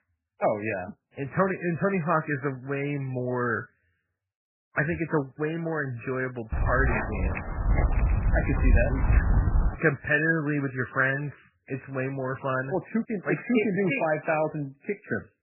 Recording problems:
garbled, watery; badly; nothing above 2.5 kHz
footsteps; loud; from 6.5 to 10 s; peak 4 dB above the speech

